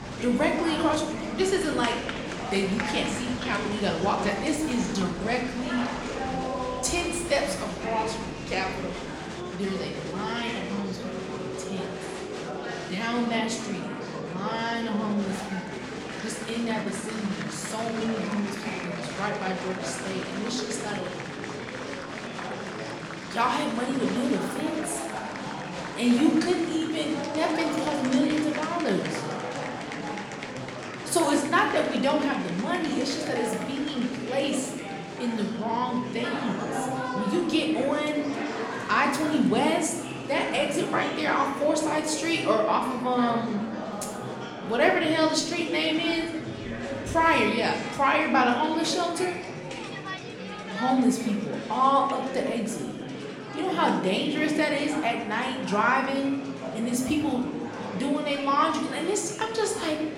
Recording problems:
room echo; slight; dies away in 0.8 s
off-mic speech; somewhat distant
murmuring crowd; loud; throughout; 7 dB below the speech
background music; faint; throughout; 25 dB below the speech

